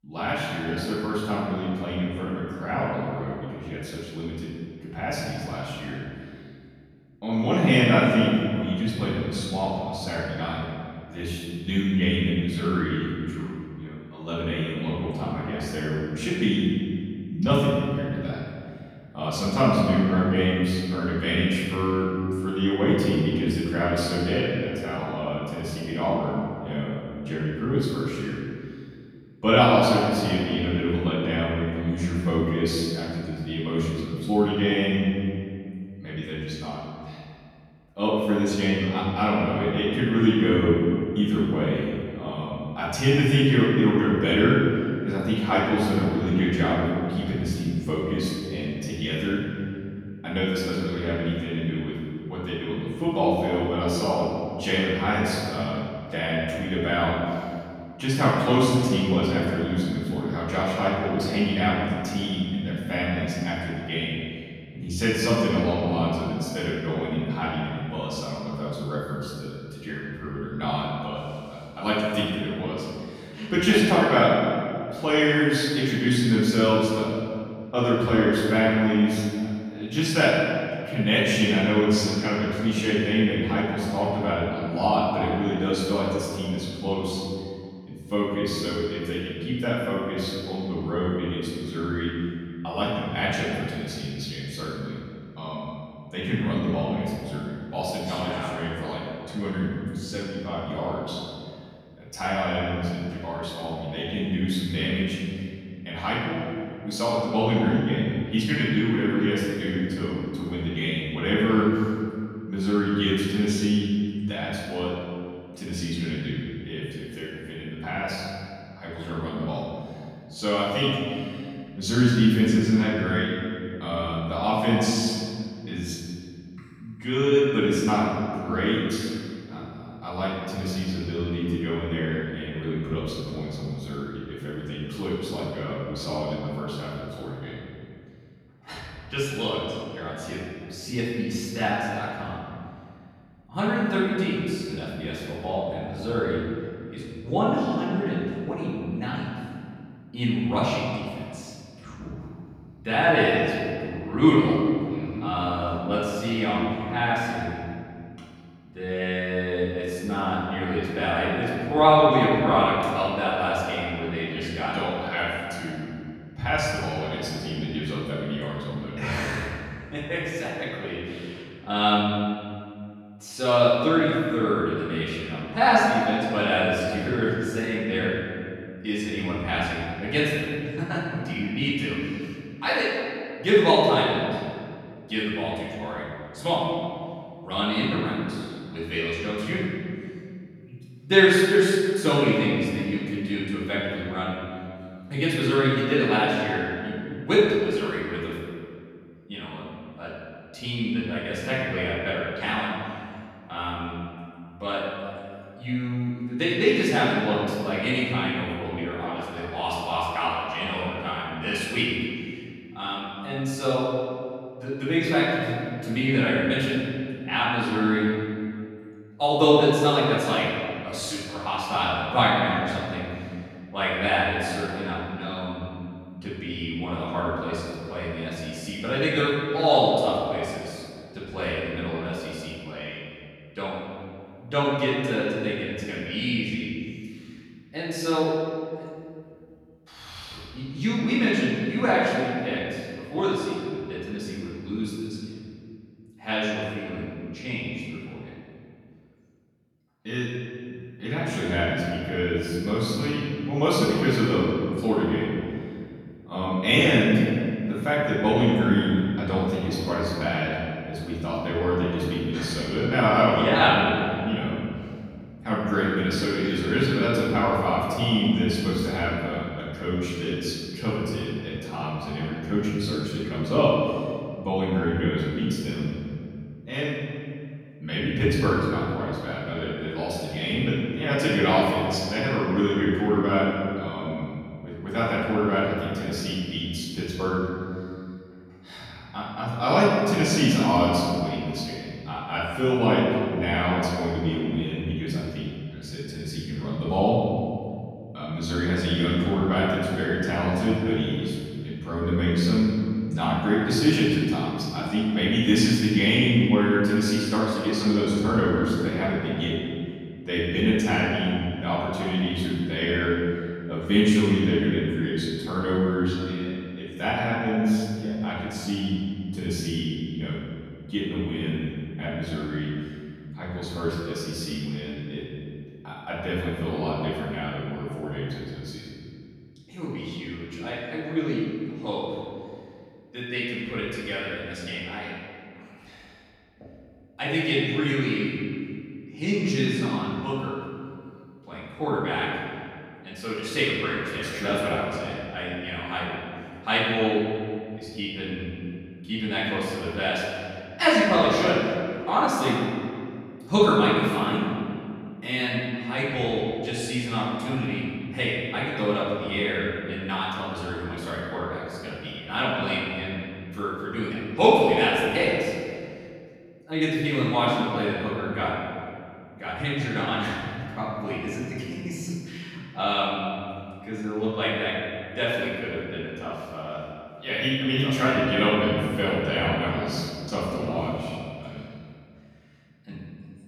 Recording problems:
room echo; strong; dies away in 2.1 s
off-mic speech; far

